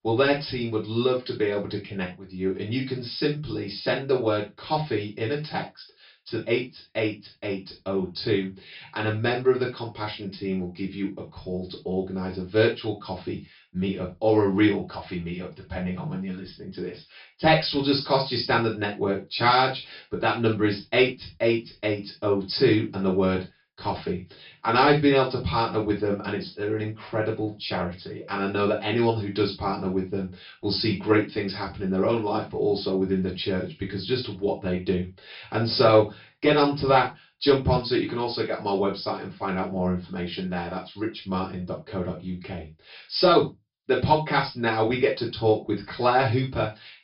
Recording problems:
off-mic speech; far
high frequencies cut off; noticeable; nothing above 5.5 kHz
room echo; slight; dies away in 0.2 s

